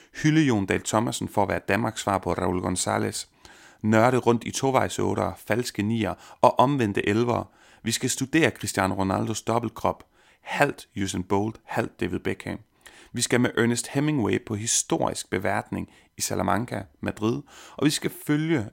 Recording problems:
none

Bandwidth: 16 kHz